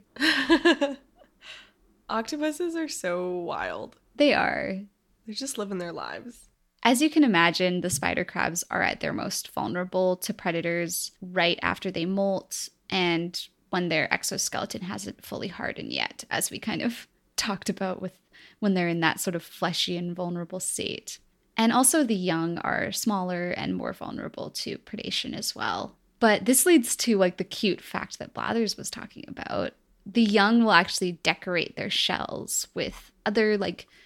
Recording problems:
none

